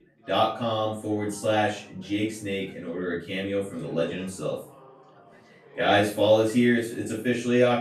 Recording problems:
off-mic speech; far
room echo; noticeable; dies away in 0.3 s
background chatter; faint; throughout; 4 voices, 25 dB below the speech

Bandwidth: 15 kHz